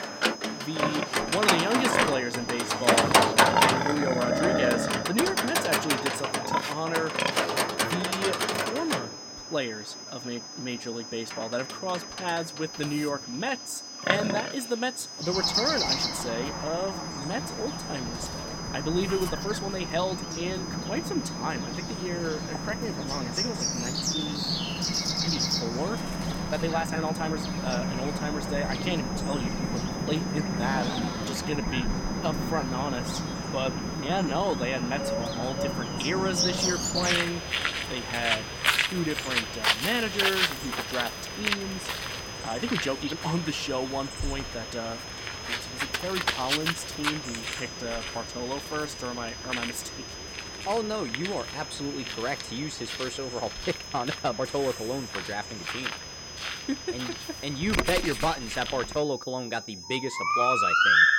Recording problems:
animal sounds; very loud; throughout; 4 dB above the speech
high-pitched whine; loud; throughout; 5 kHz, 7 dB below the speech
chatter from many people; faint; throughout; 25 dB below the speech
uneven, jittery; strongly; from 5 to 55 s

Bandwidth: 16.5 kHz